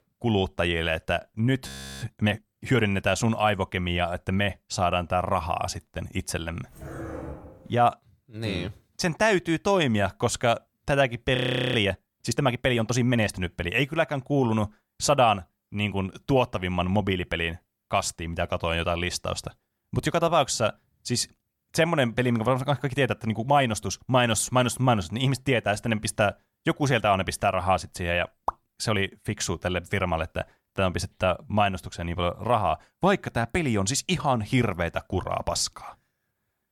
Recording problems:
audio freezing; at 1.5 s and at 11 s
dog barking; faint; from 6.5 to 8 s; peak 10 dB below the speech

